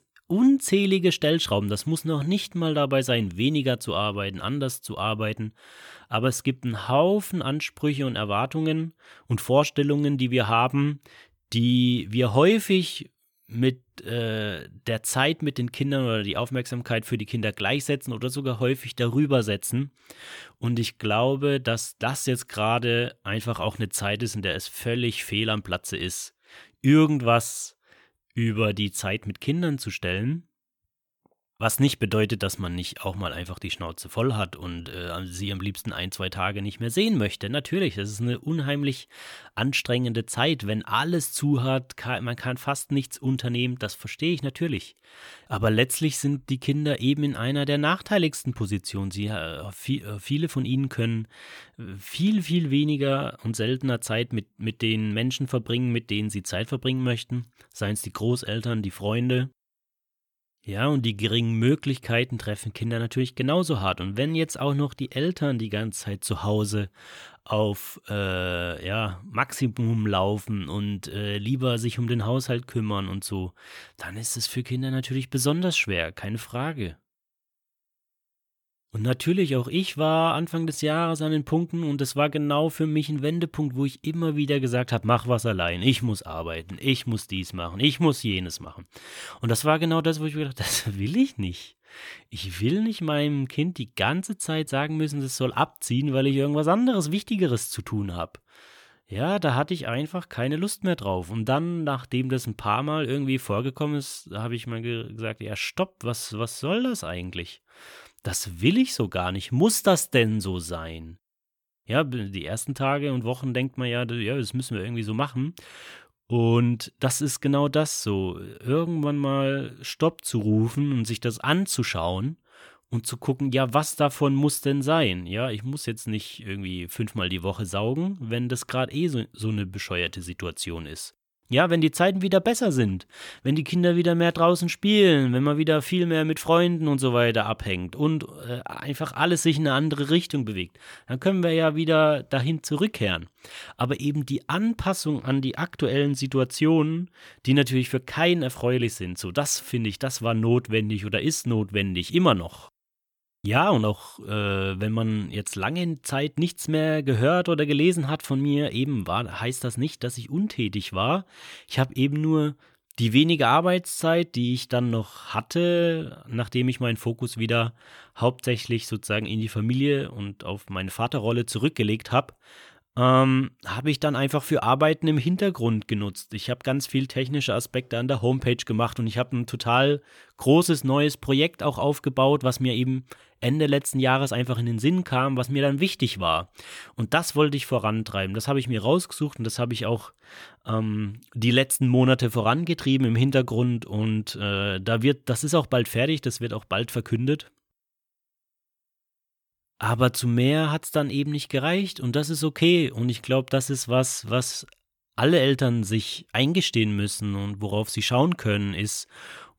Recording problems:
none

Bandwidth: 18.5 kHz